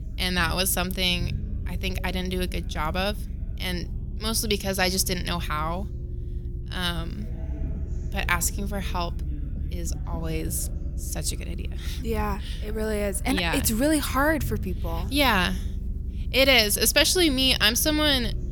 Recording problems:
background chatter; faint; throughout; 4 voices, 30 dB below the speech
low rumble; faint; throughout; 25 dB below the speech

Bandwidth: 18 kHz